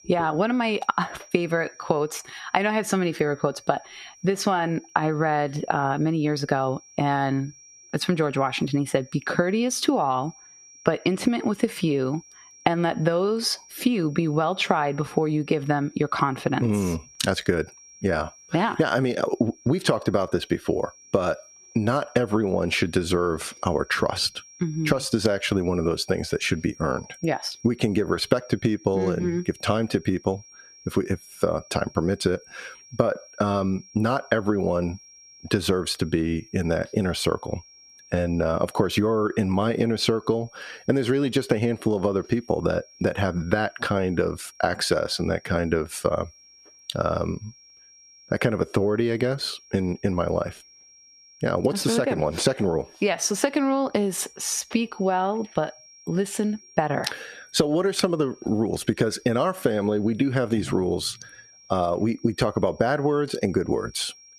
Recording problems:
squashed, flat; somewhat
high-pitched whine; faint; throughout; 5.5 kHz, 25 dB below the speech

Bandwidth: 14.5 kHz